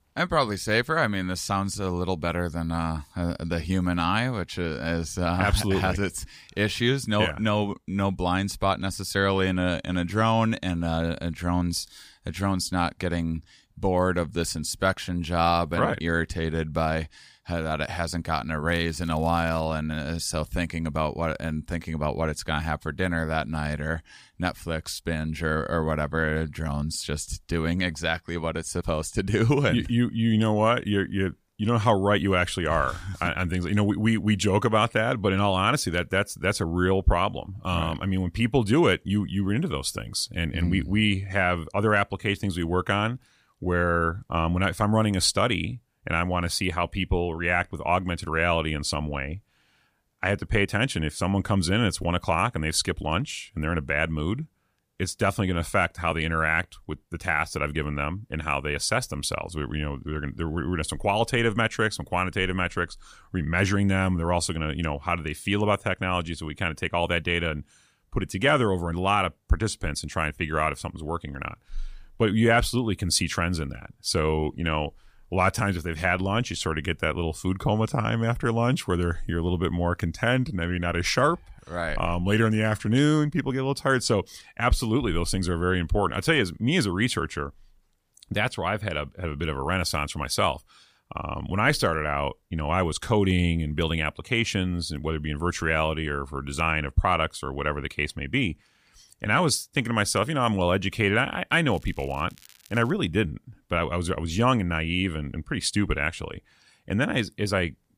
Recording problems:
crackling; faint; at 19 s and from 1:42 to 1:43; 25 dB below the speech

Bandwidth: 15 kHz